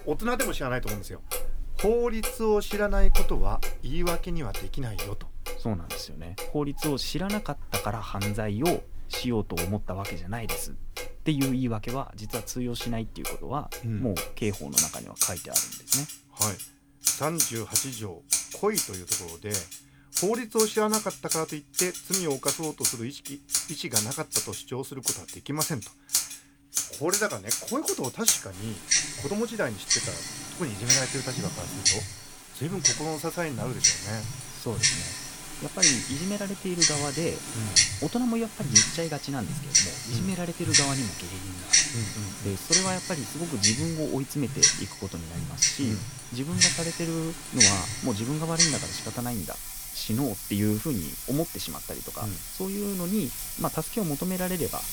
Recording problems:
household noises; very loud; throughout; 5 dB above the speech

